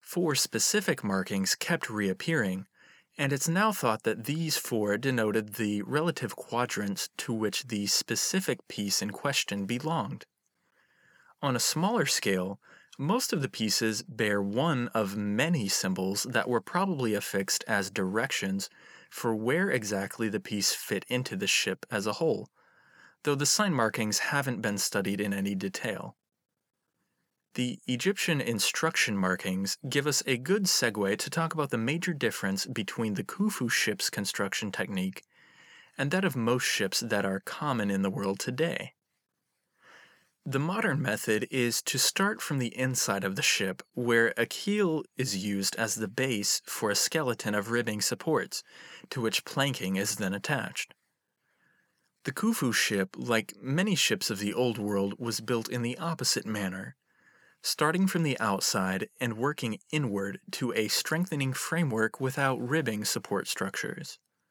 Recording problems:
none

